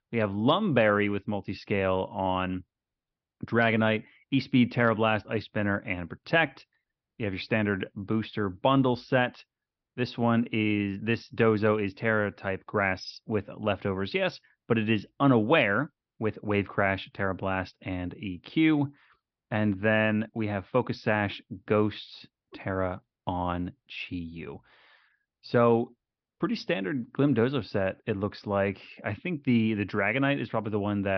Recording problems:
high frequencies cut off; noticeable; nothing above 5.5 kHz
abrupt cut into speech; at the end

